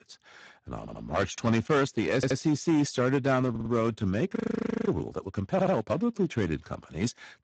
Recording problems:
garbled, watery; badly; nothing above 7.5 kHz
distortion; slight; 6% of the sound clipped
audio stuttering; 4 times, first at 1 s
audio freezing; at 4.5 s for 0.5 s

